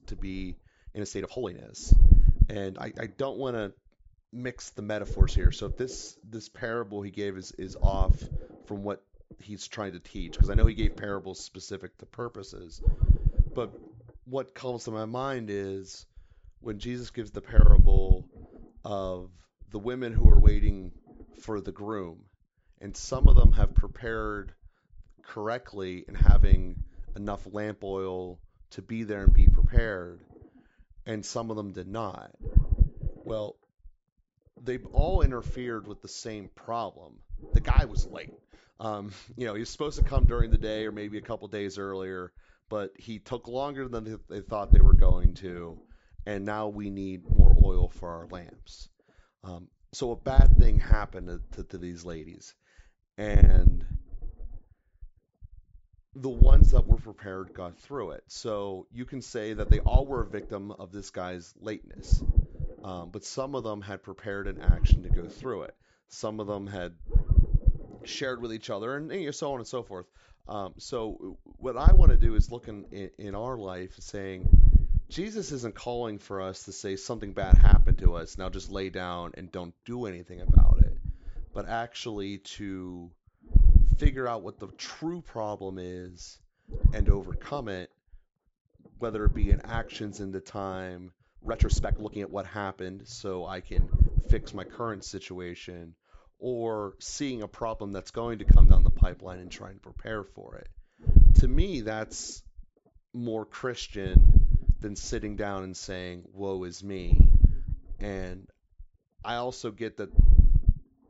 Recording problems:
high frequencies cut off; noticeable; nothing above 8 kHz
distortion; slight; 10 dB below the speech
low rumble; loud; throughout; 7 dB below the speech
uneven, jittery; strongly; from 0.5 s to 1:32

